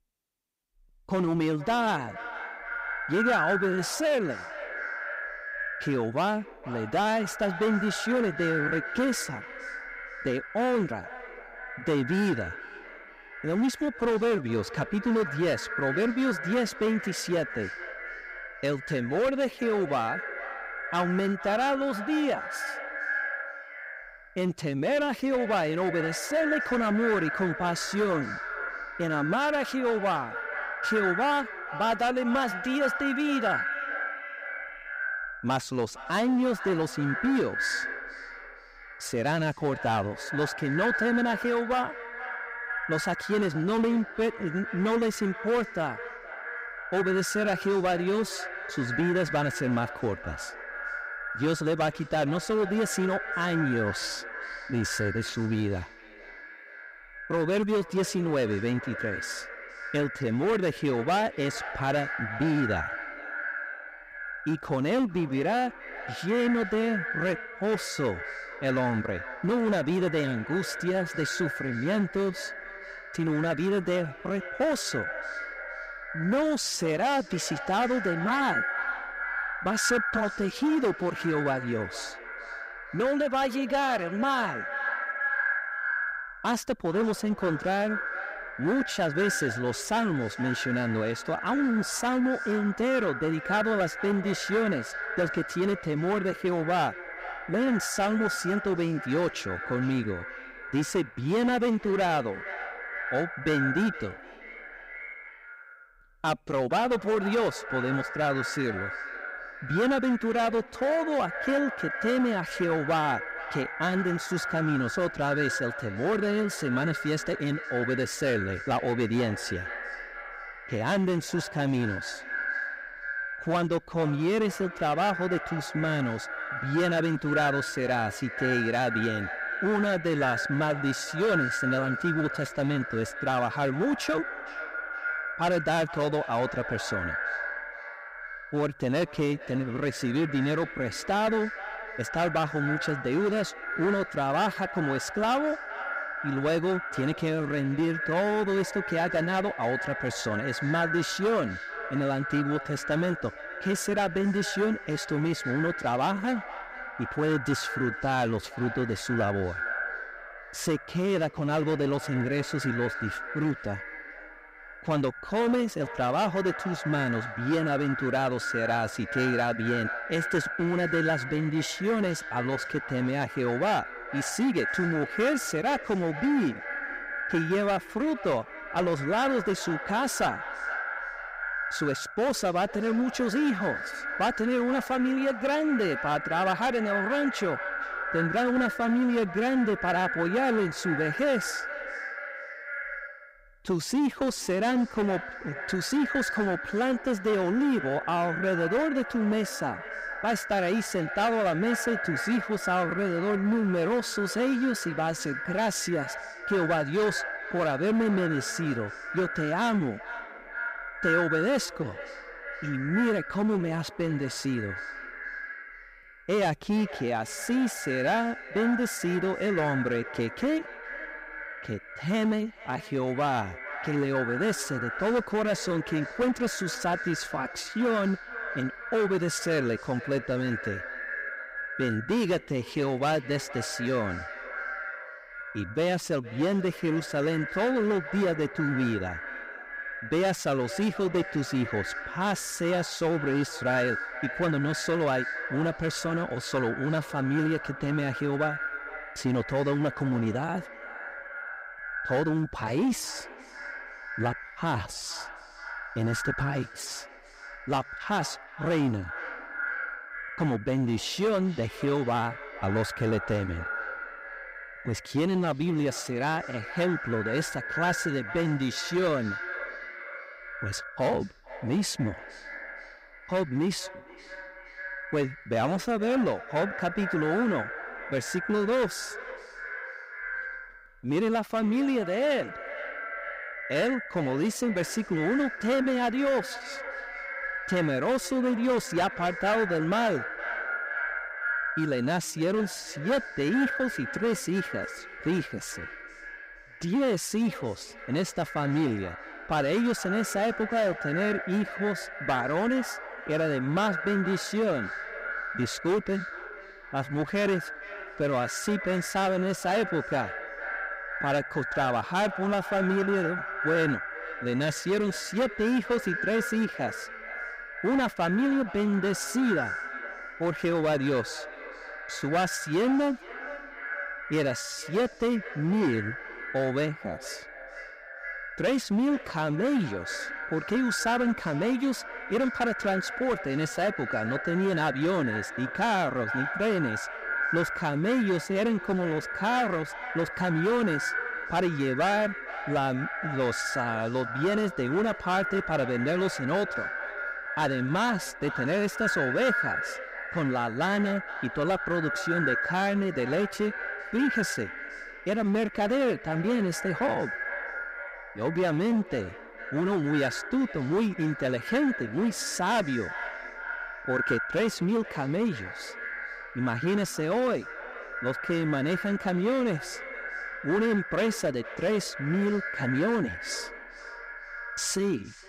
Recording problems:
echo of what is said; strong; throughout; 460 ms later, 7 dB below the speech
distortion; slight; 8% of the sound clipped

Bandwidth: 15.5 kHz